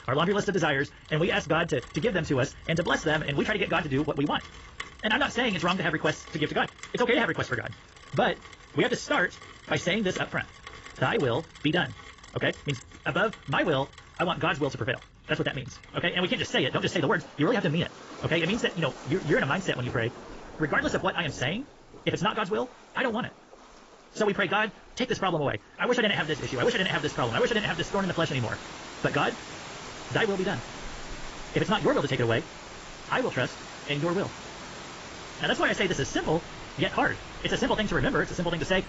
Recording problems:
garbled, watery; badly; nothing above 7.5 kHz
wrong speed, natural pitch; too fast; 1.7 times normal speed
rain or running water; noticeable; throughout; 15 dB below the speech

